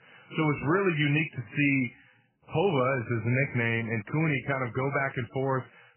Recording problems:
garbled, watery; badly; nothing above 2.5 kHz

